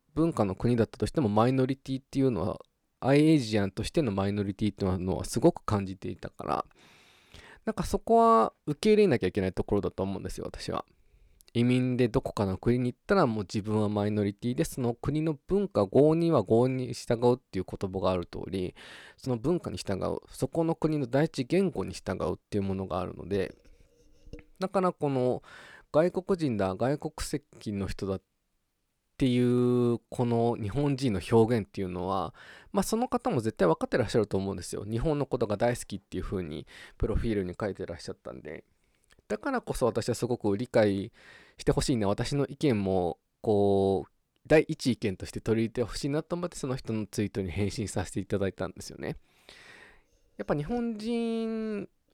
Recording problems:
uneven, jittery; strongly; from 1 to 49 s

